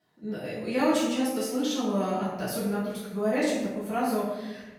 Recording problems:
off-mic speech; far
room echo; noticeable; dies away in 1 s

